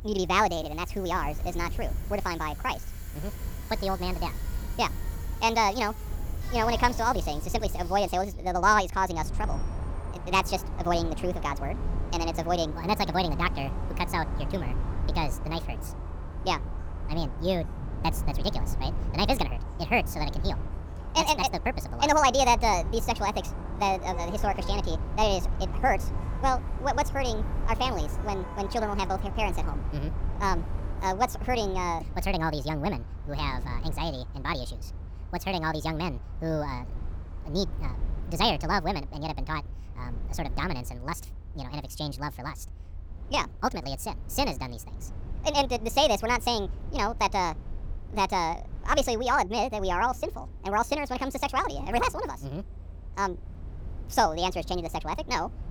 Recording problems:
wrong speed and pitch; too fast and too high; 1.6 times normal speed
traffic noise; noticeable; throughout; 15 dB below the speech
low rumble; faint; throughout; 25 dB below the speech

